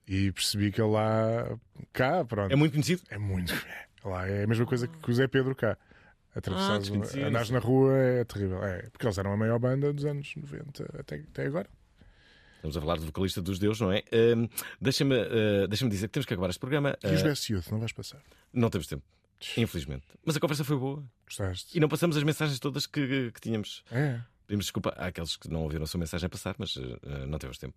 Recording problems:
none

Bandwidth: 14.5 kHz